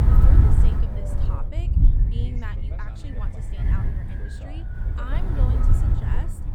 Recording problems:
wind noise on the microphone; heavy; 4 dB above the speech
voice in the background; loud; throughout; 6 dB below the speech

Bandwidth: 18 kHz